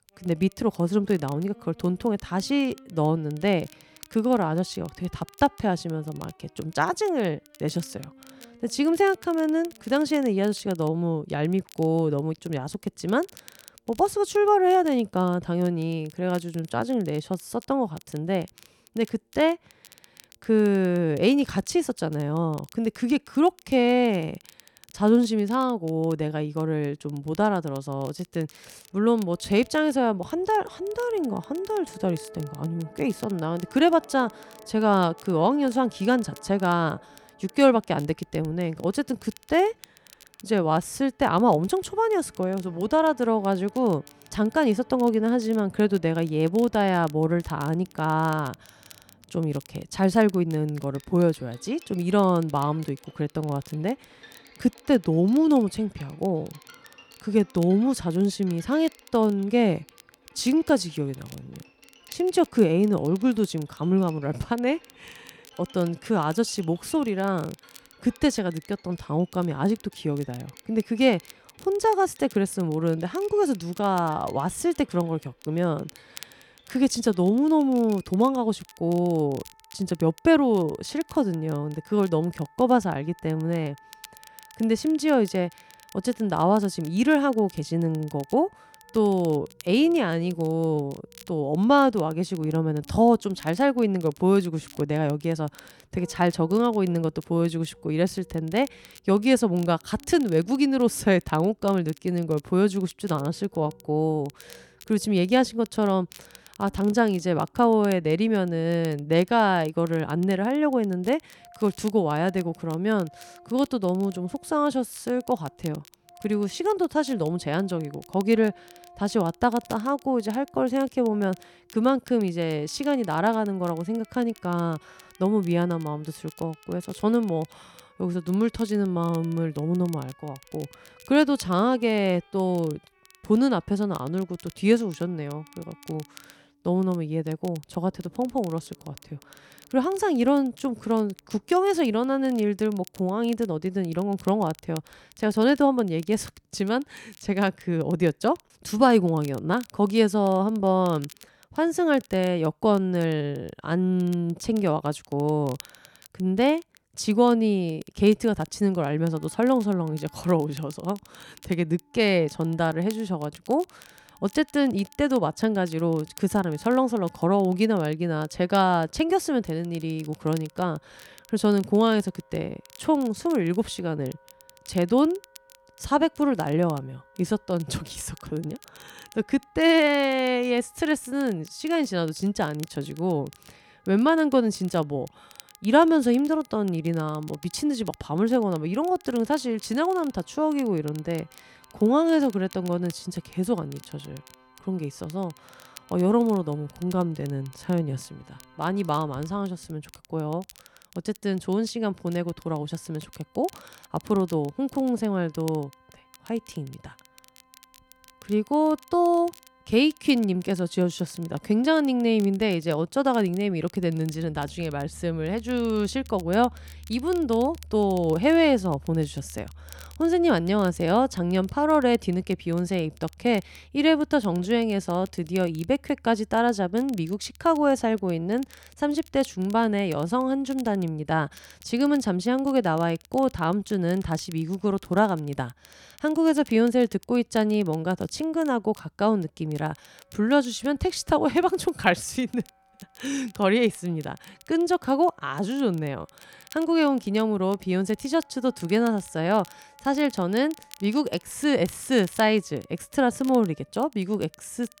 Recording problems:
background music; faint; throughout; 30 dB below the speech
crackle, like an old record; faint; 25 dB below the speech

